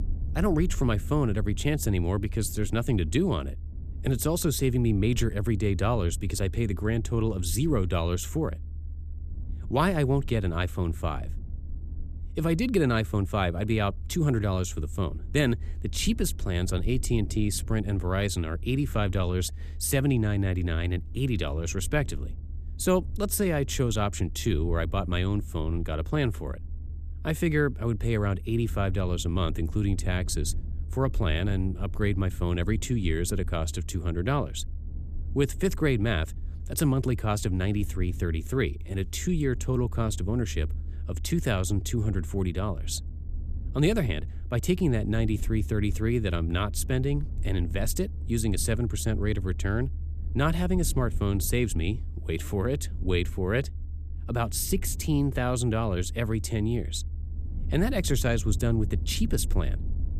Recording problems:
low rumble; faint; throughout; 20 dB below the speech

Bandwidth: 14.5 kHz